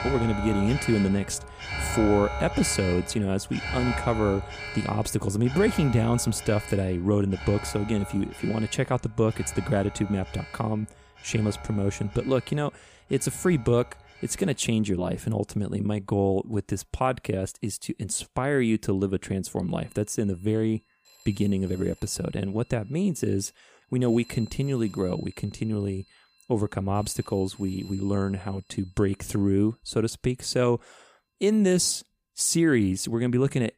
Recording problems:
alarms or sirens; noticeable; throughout; 10 dB below the speech

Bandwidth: 15 kHz